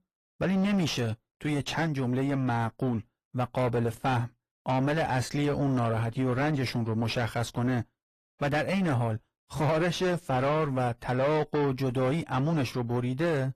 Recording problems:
distortion; heavy; 6 dB below the speech
garbled, watery; slightly; nothing above 15 kHz

